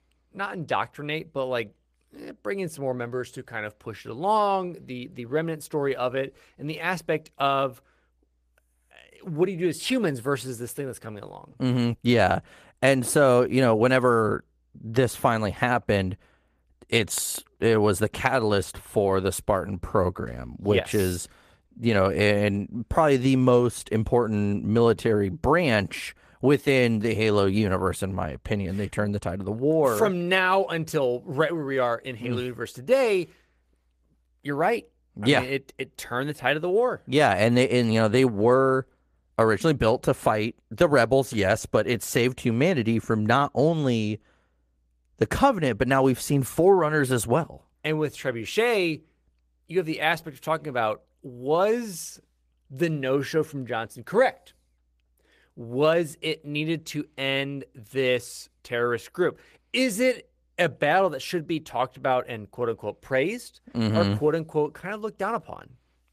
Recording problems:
garbled, watery; slightly; nothing above 14.5 kHz

